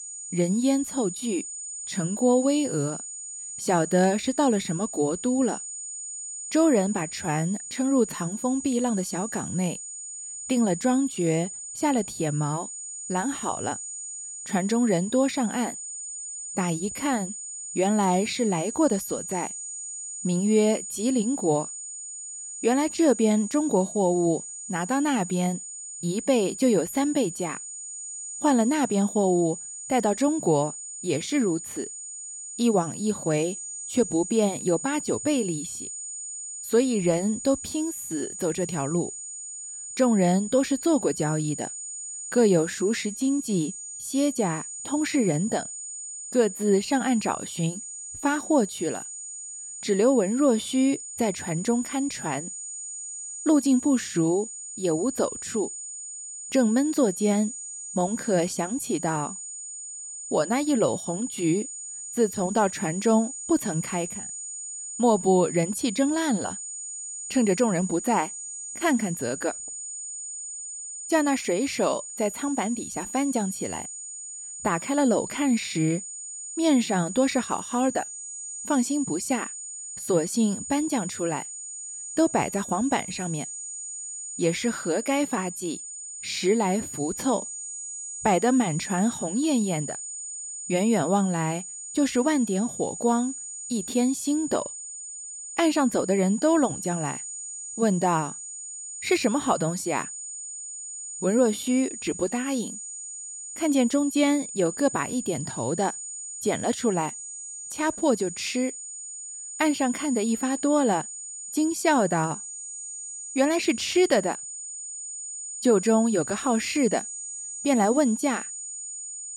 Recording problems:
high-pitched whine; loud; throughout; 7 kHz, 9 dB below the speech

